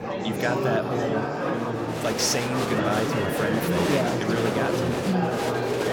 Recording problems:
murmuring crowd; very loud; throughout; 2 dB above the speech

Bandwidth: 17 kHz